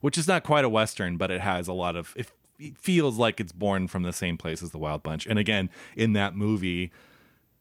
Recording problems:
none

